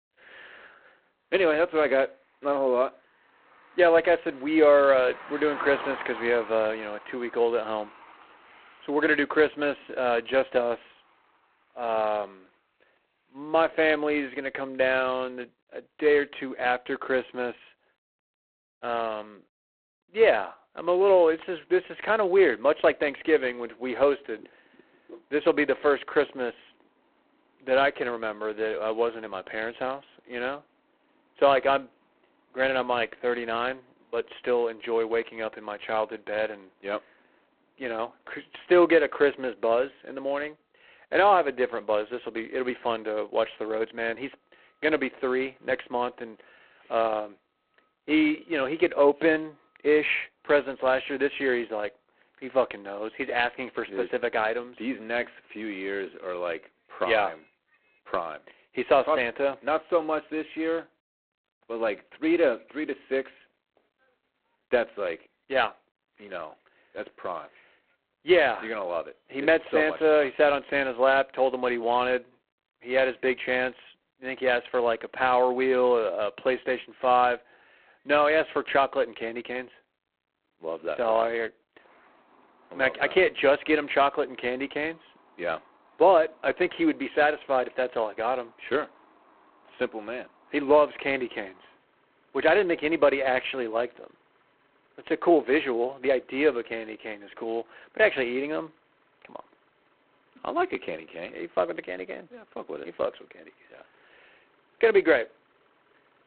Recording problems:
phone-call audio; poor line; nothing above 4 kHz
traffic noise; faint; throughout; 25 dB below the speech

